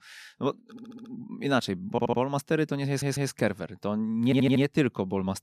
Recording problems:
audio stuttering; 4 times, first at 0.5 s

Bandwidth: 14.5 kHz